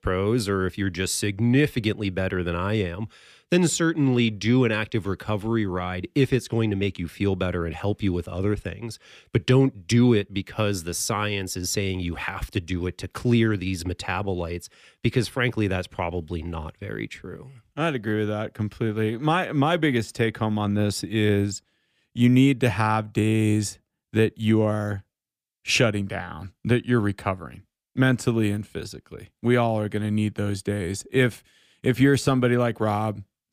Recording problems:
none

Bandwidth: 15 kHz